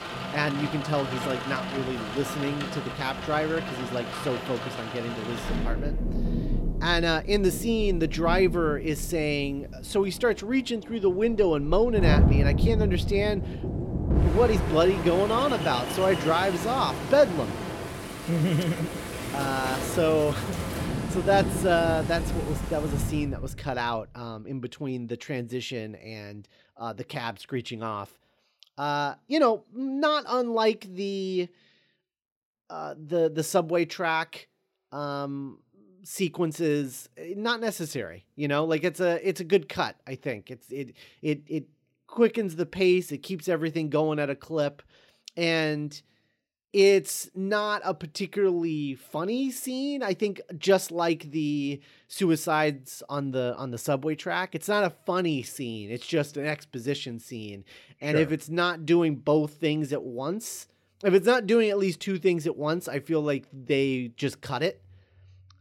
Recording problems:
rain or running water; loud; until 23 s; 4 dB below the speech

